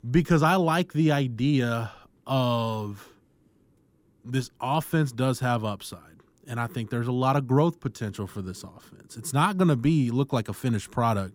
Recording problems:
none

